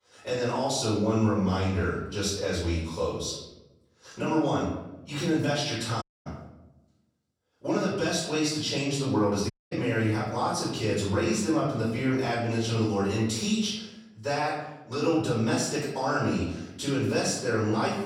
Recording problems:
off-mic speech; far
room echo; noticeable; dies away in 0.8 s
audio cutting out; at 6 s and at 9.5 s

